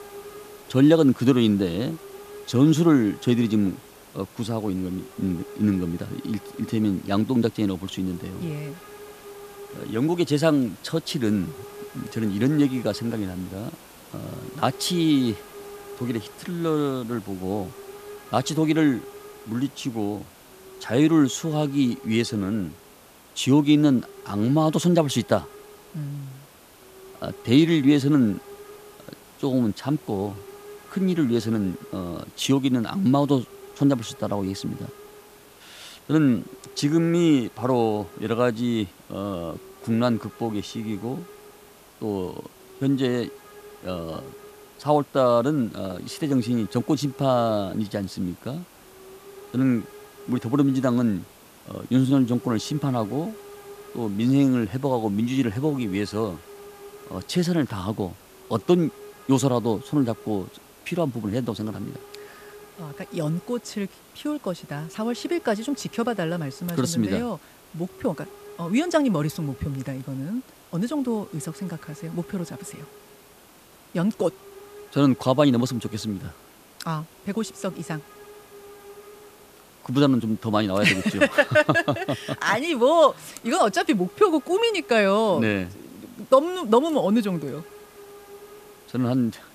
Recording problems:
hiss; faint; throughout; 20 dB below the speech

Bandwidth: 14.5 kHz